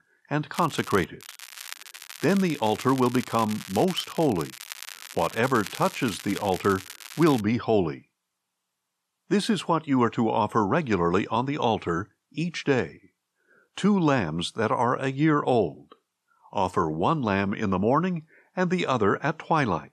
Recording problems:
crackling; noticeable; at 0.5 s and from 1 to 7.5 s; 15 dB below the speech

